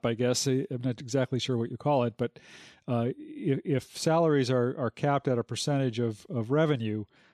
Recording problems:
none

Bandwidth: 13.5 kHz